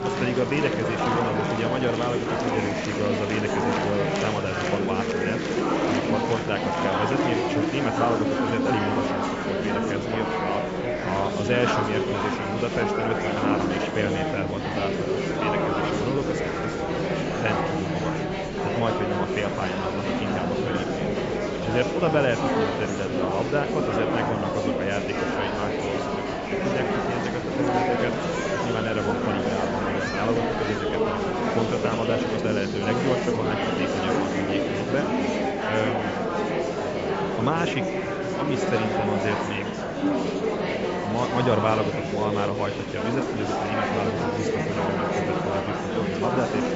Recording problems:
high frequencies cut off; noticeable; nothing above 8 kHz
murmuring crowd; very loud; throughout; 3 dB above the speech
electrical hum; noticeable; throughout; 50 Hz, 20 dB below the speech

